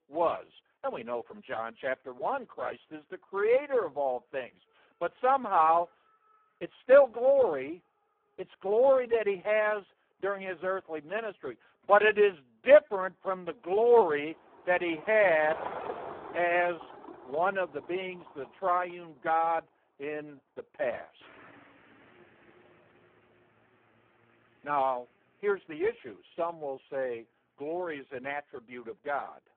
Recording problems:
phone-call audio; poor line
traffic noise; noticeable; throughout; 15 dB below the speech

